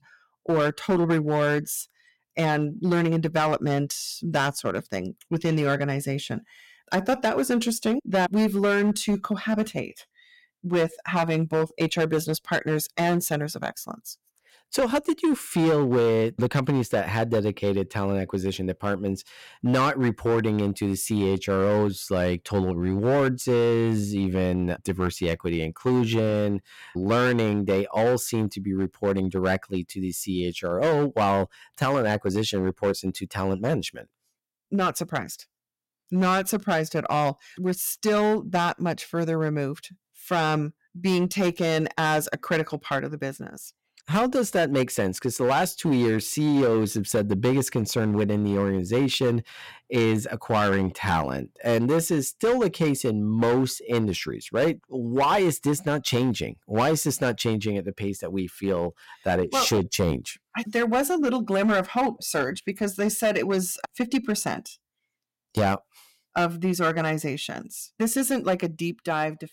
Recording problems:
distortion; slight; 8% of the sound clipped

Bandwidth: 16.5 kHz